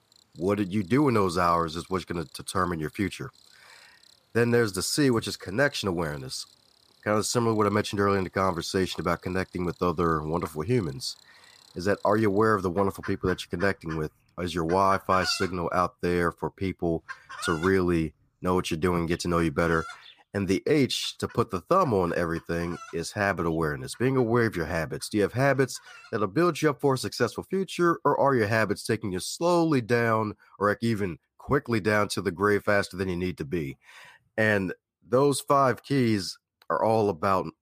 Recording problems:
animal sounds; noticeable; throughout; 20 dB below the speech

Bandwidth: 15 kHz